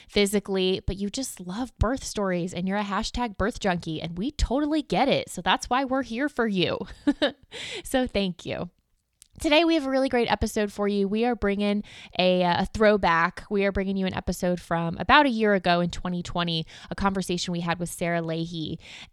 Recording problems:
none

